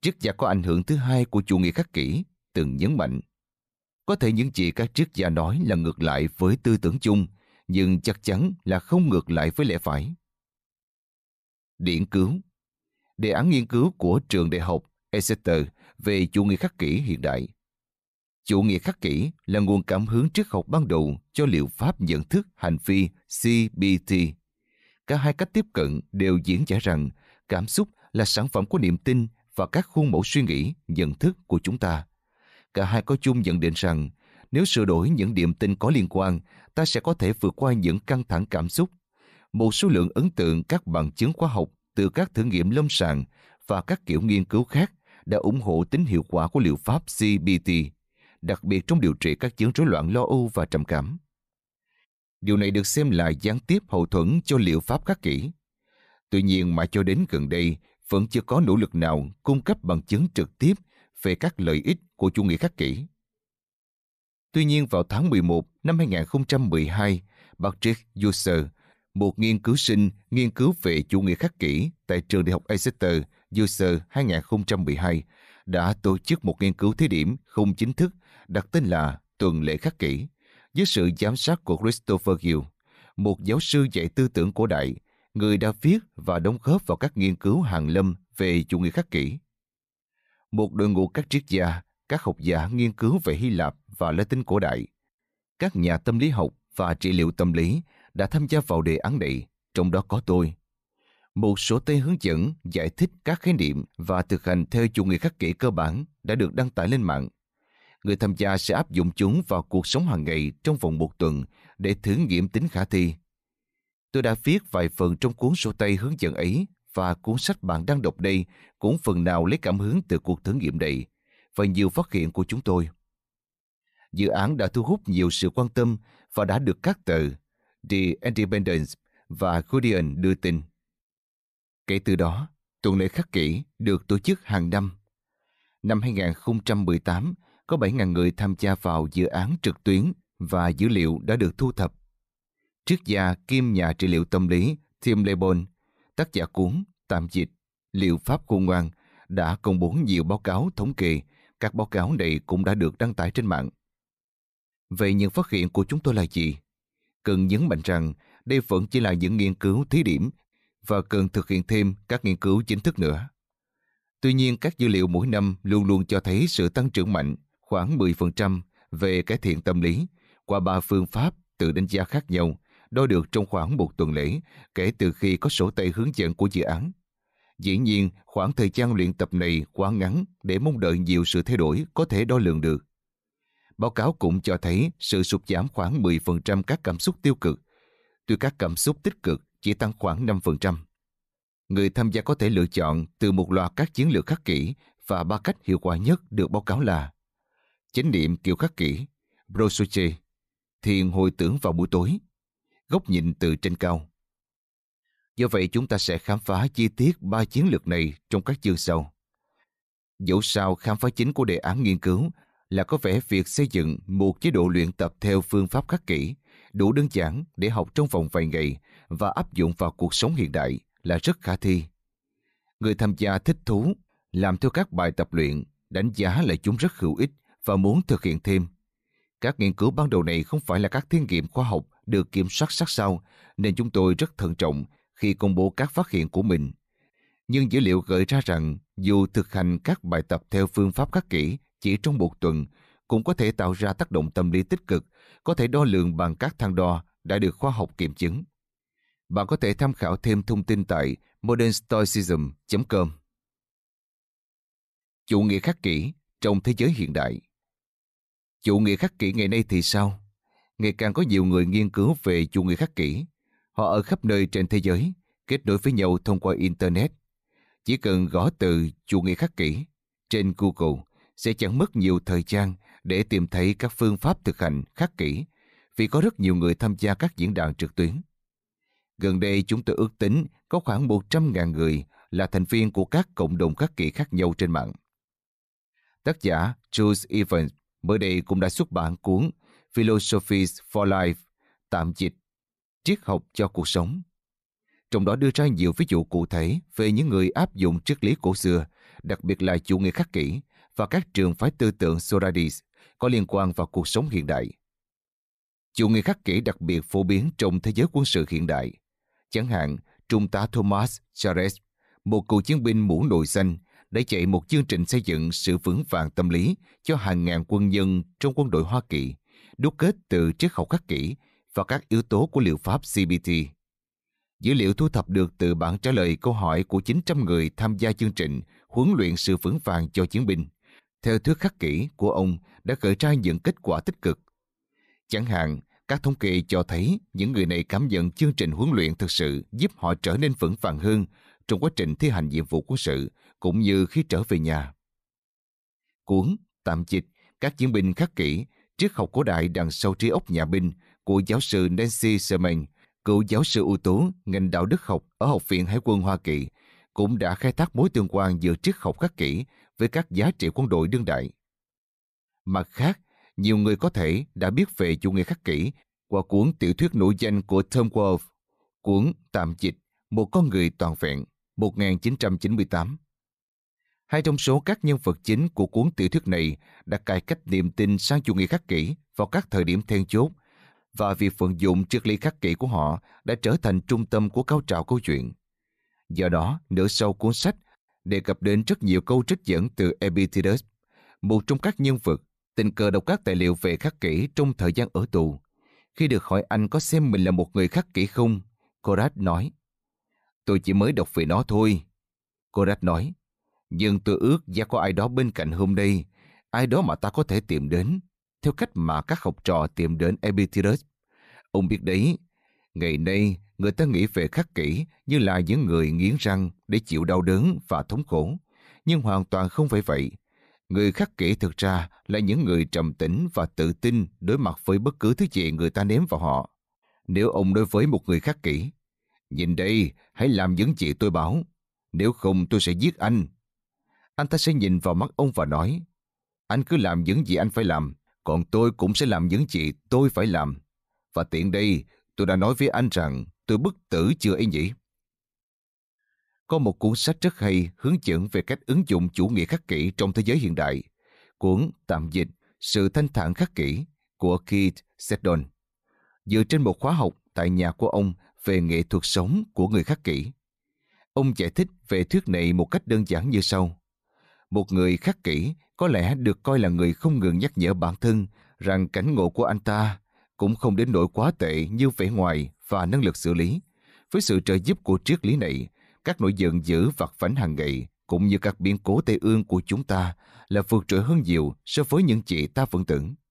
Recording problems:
none

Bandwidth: 14.5 kHz